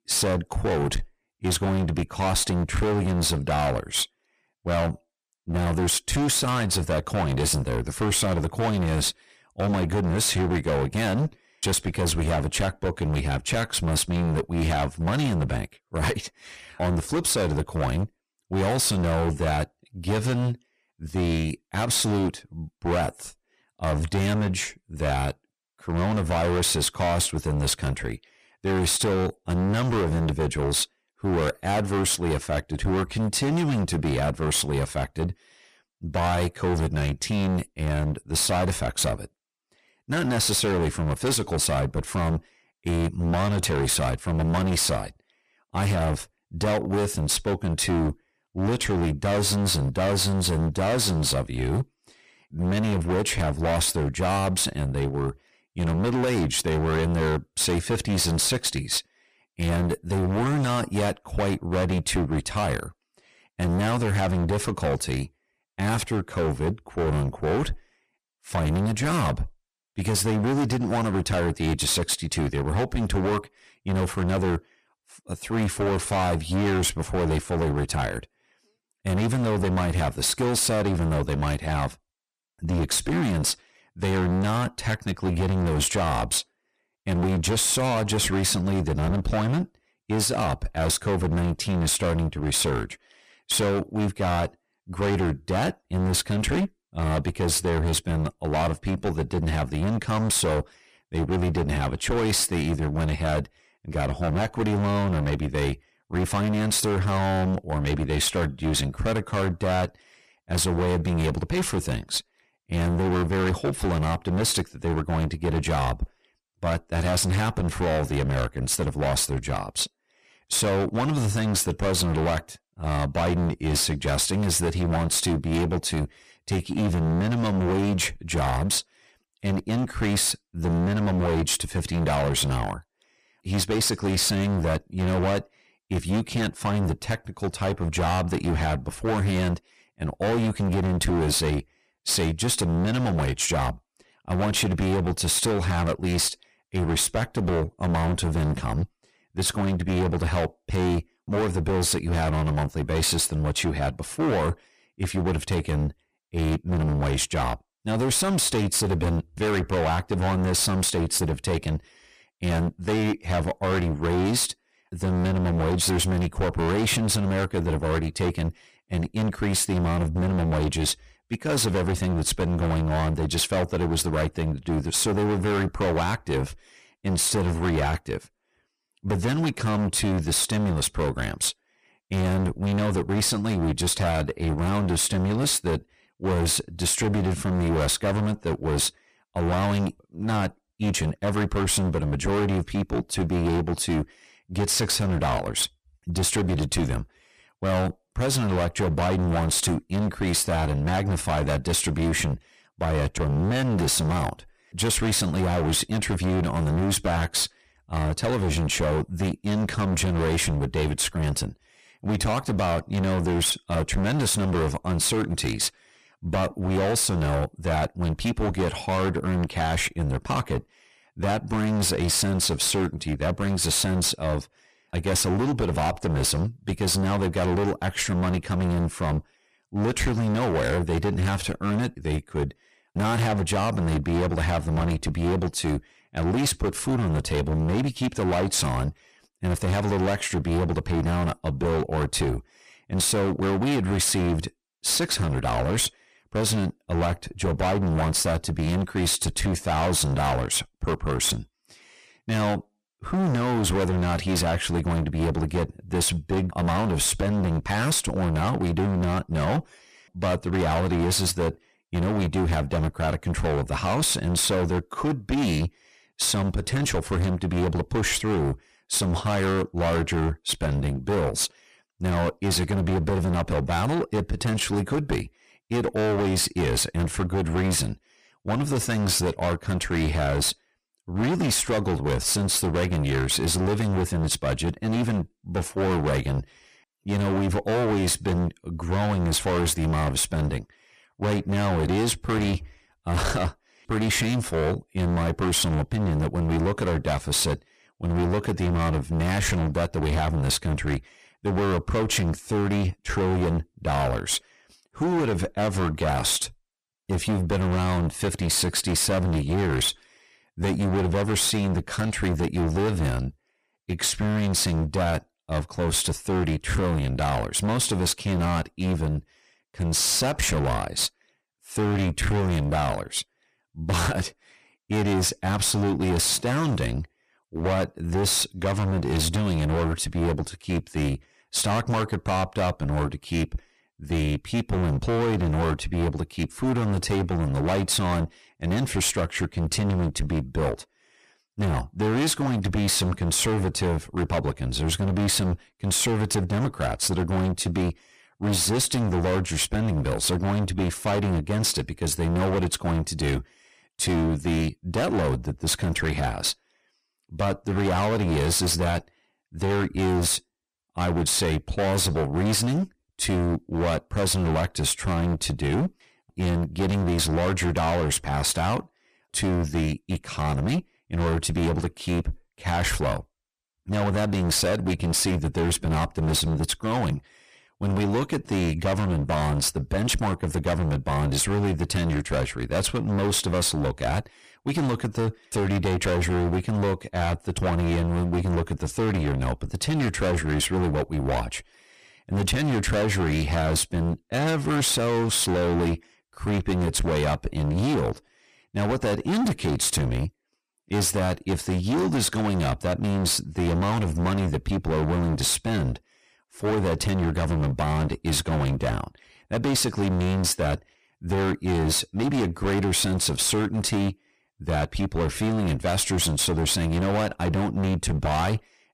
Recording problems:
distortion; heavy; 26% of the sound clipped

